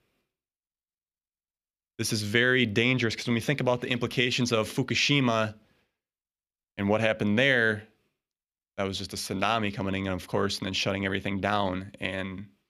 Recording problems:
none

